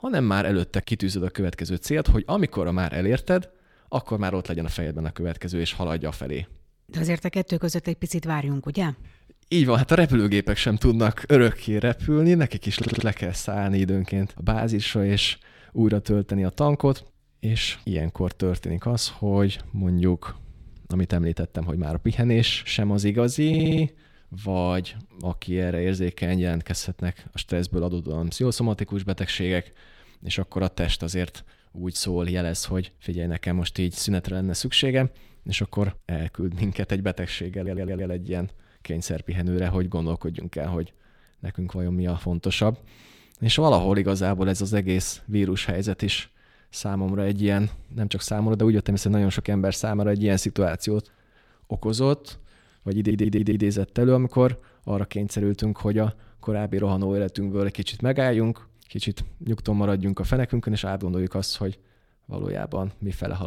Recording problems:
audio stuttering; 4 times, first at 13 s
abrupt cut into speech; at the end

